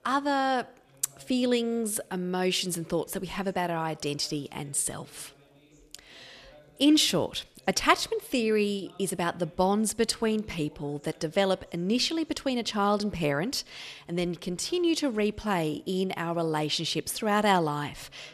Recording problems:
background chatter; faint; throughout; 3 voices, 30 dB below the speech

